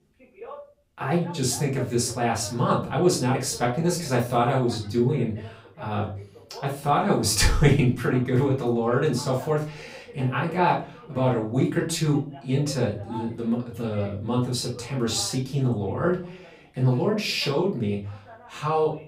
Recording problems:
off-mic speech; far
room echo; slight; dies away in 0.3 s
voice in the background; faint; throughout; 20 dB below the speech

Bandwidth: 15.5 kHz